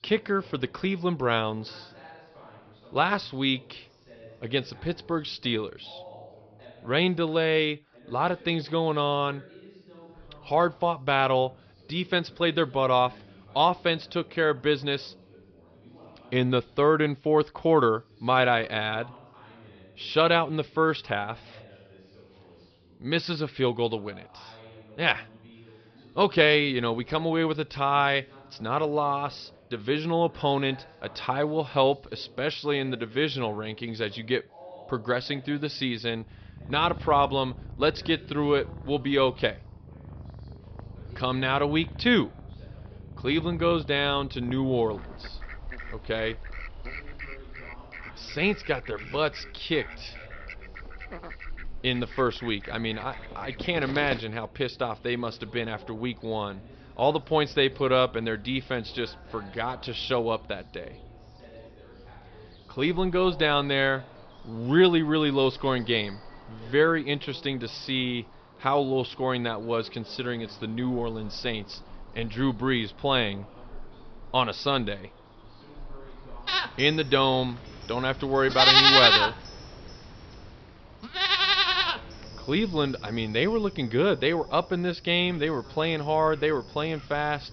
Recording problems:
high frequencies cut off; noticeable; nothing above 5.5 kHz
animal sounds; very loud; from 36 s on; 2 dB above the speech
background chatter; faint; throughout; 2 voices, 25 dB below the speech

